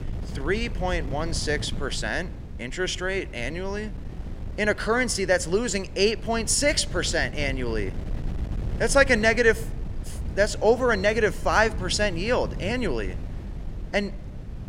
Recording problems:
wind noise on the microphone; occasional gusts; 20 dB below the speech

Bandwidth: 16 kHz